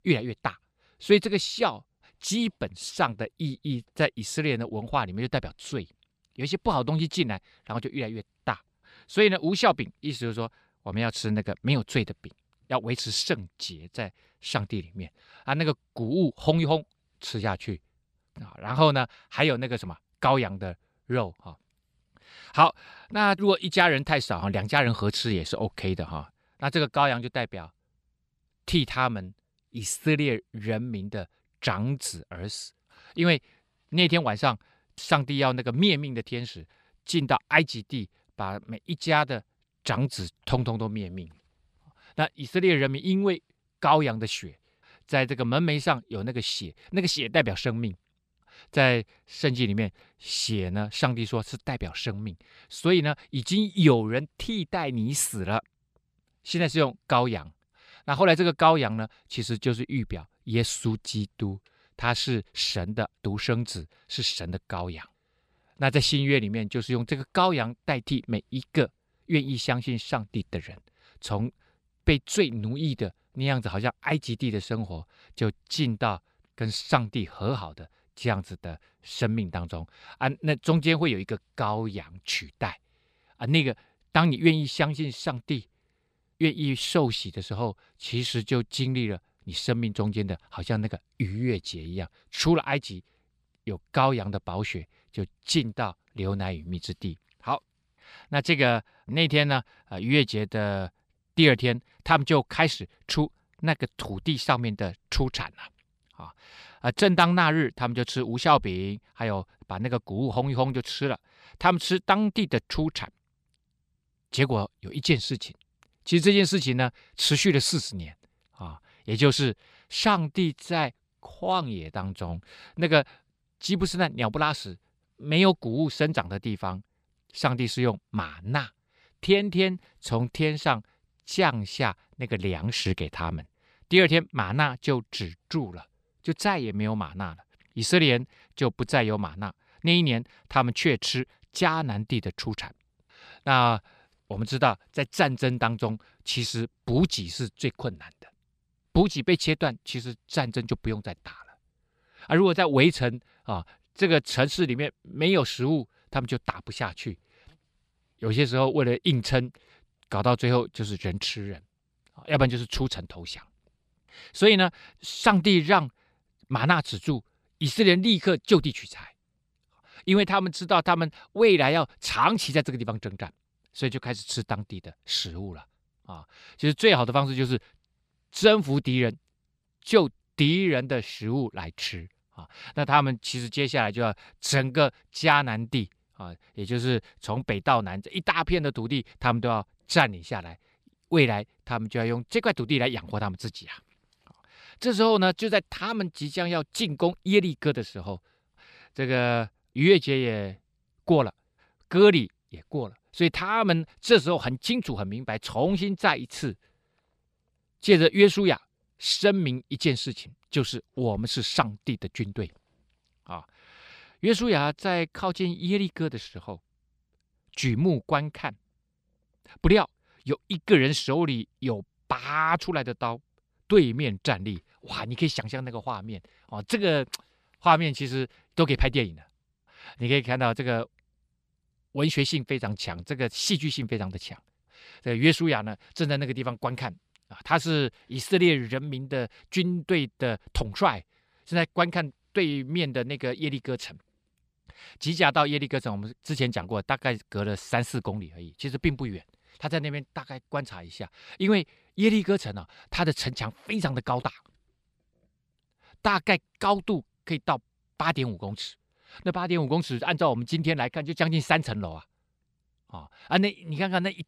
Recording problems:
none

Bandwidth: 14.5 kHz